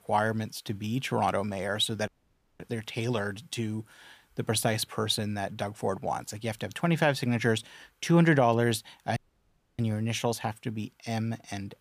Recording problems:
audio cutting out; at 2 s for 0.5 s and at 9 s for 0.5 s

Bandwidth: 15 kHz